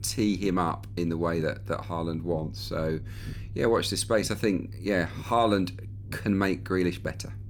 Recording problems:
low rumble; faint; throughout; 25 dB below the speech

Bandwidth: 18.5 kHz